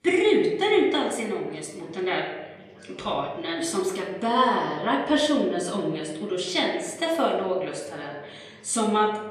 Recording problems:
off-mic speech; far
room echo; slight; dies away in 0.8 s
chatter from many people; faint; throughout; 25 dB below the speech

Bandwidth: 14.5 kHz